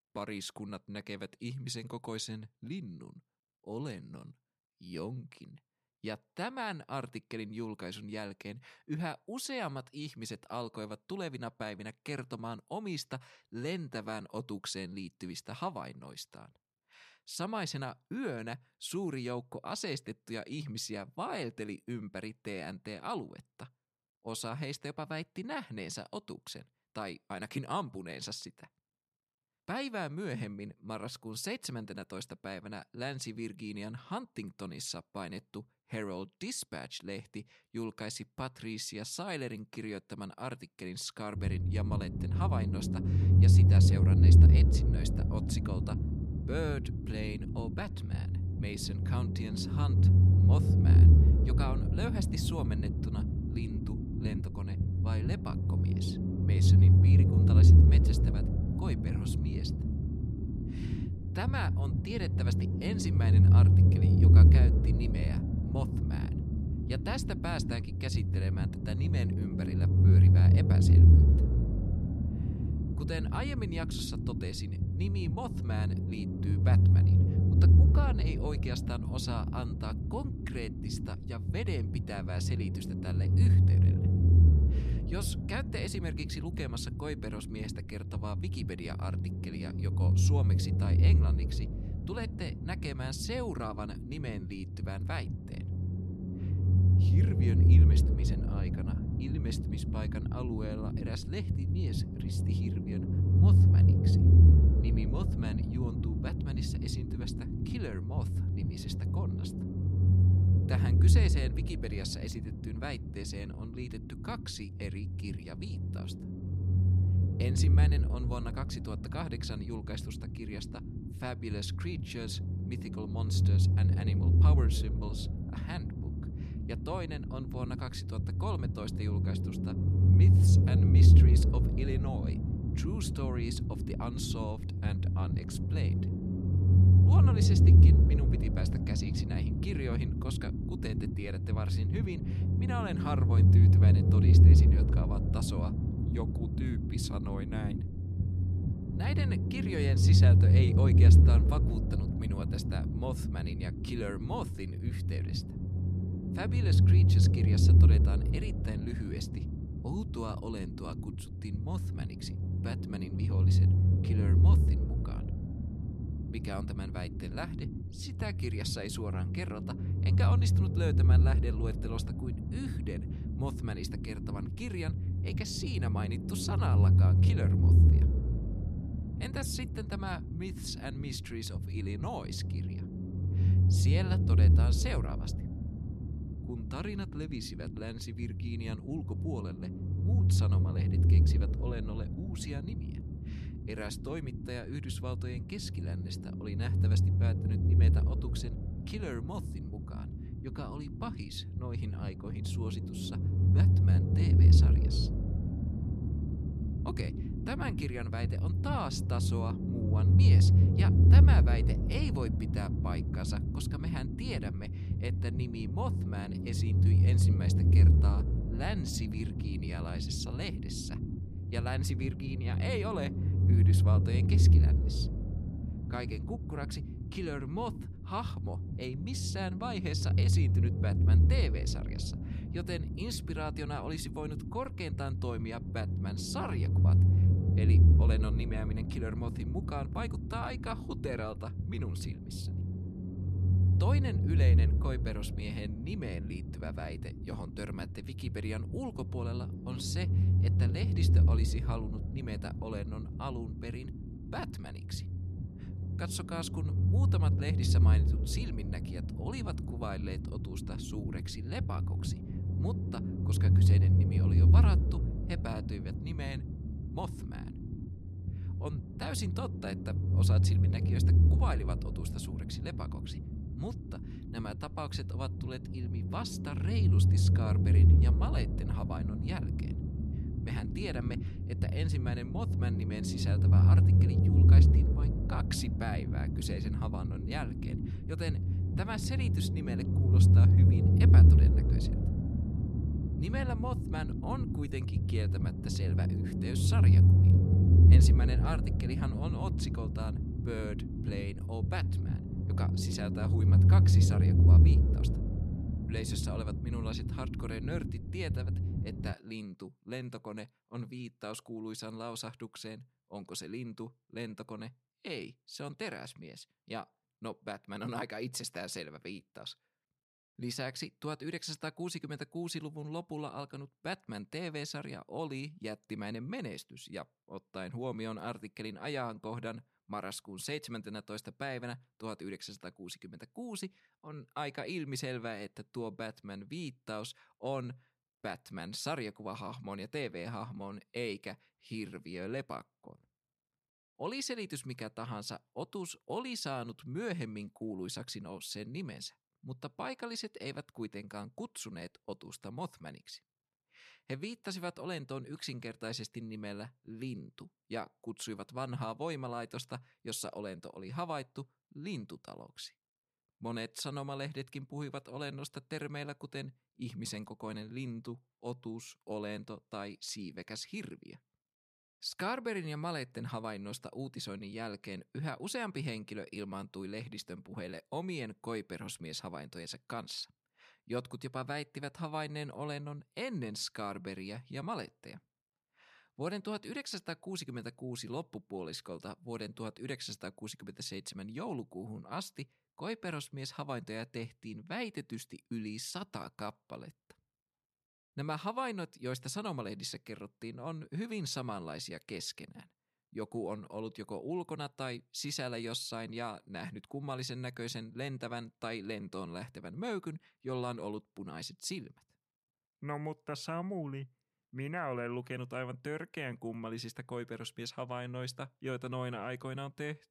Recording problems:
low rumble; loud; from 41 s to 5:09; as loud as the speech

